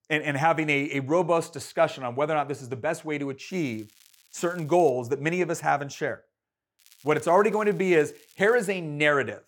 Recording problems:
crackling; faint; from 3.5 to 5 s and from 7 to 8.5 s; 30 dB below the speech

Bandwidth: 17.5 kHz